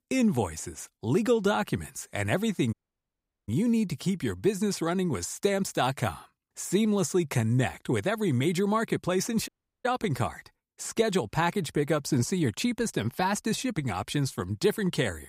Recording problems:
audio cutting out; at 2.5 s for 1 s and at 9.5 s

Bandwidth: 15.5 kHz